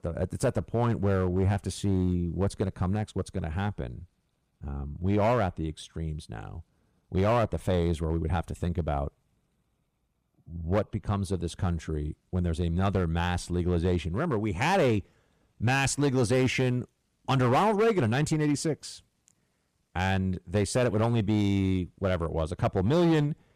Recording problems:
distortion; slight; 5% of the sound clipped

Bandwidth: 15 kHz